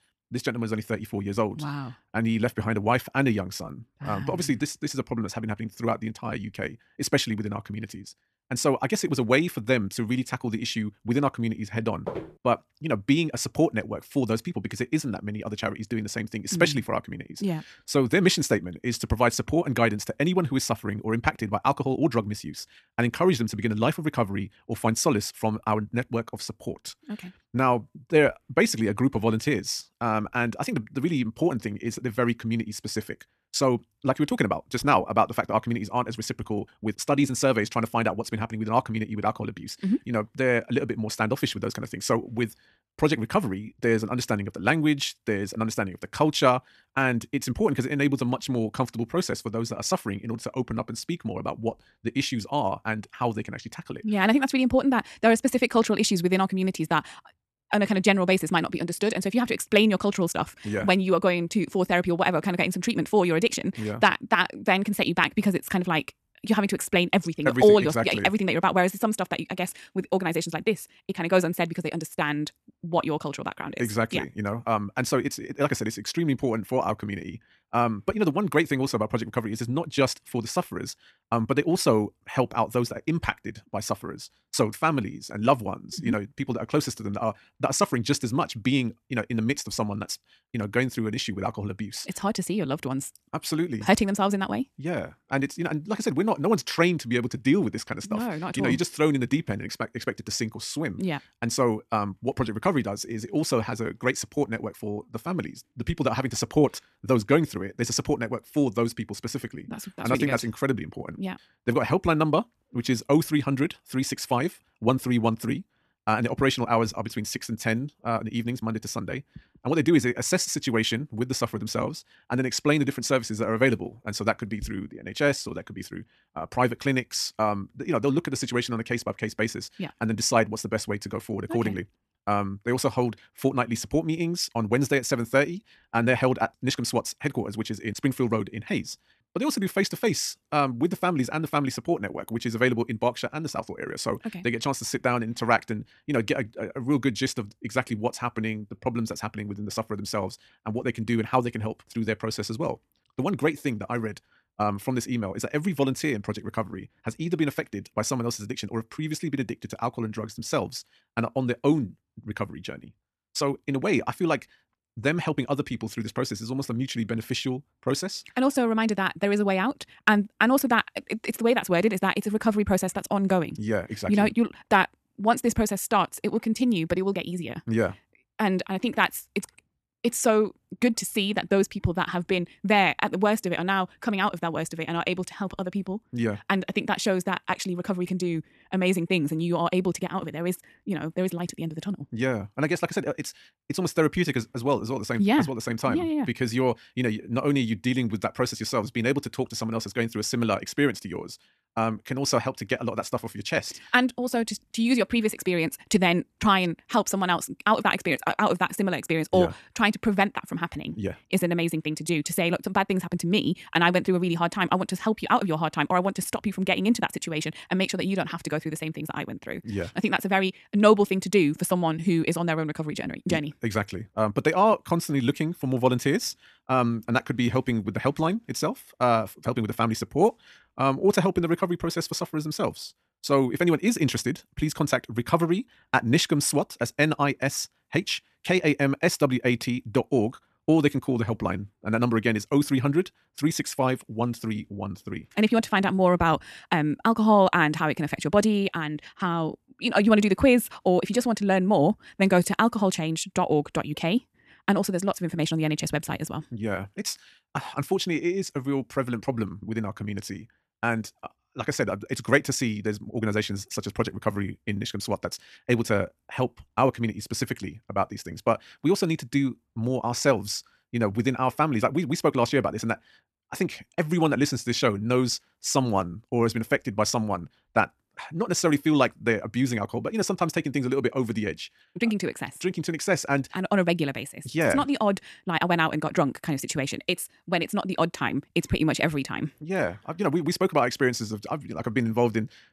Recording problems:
wrong speed, natural pitch; too fast; 1.5 times normal speed
footsteps; noticeable; at 12 s; peak 9 dB below the speech

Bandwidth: 14 kHz